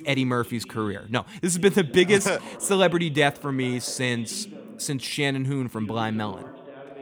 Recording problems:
voice in the background; noticeable; throughout; 20 dB below the speech

